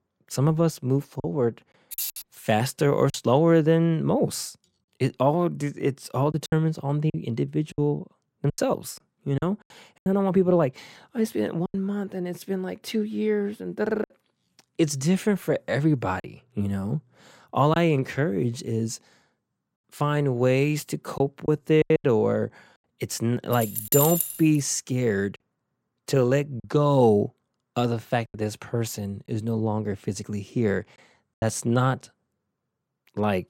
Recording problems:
choppy; occasionally; 4% of the speech affected
jangling keys; noticeable; at 2 s; peak 5 dB below the speech
jangling keys; loud; at 24 s; peak 3 dB above the speech

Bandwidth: 16 kHz